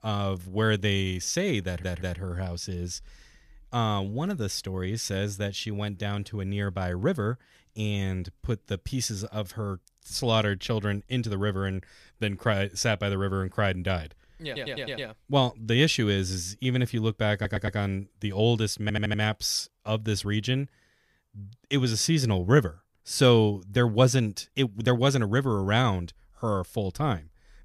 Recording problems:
audio stuttering; 4 times, first at 1.5 s

